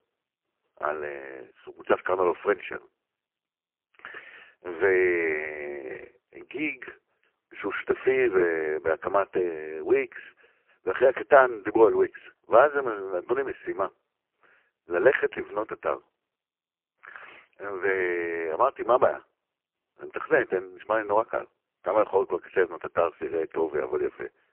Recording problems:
phone-call audio; poor line

